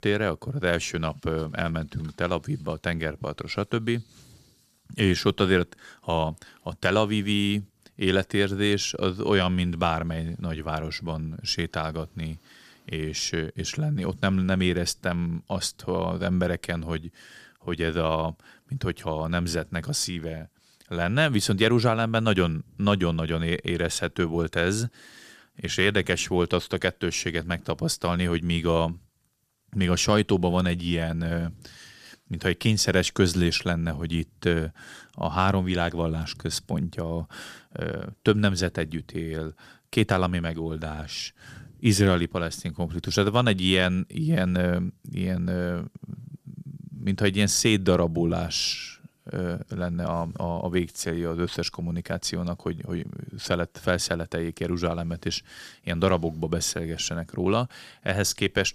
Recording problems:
none

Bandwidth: 14.5 kHz